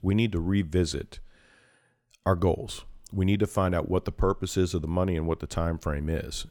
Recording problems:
none

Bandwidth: 18 kHz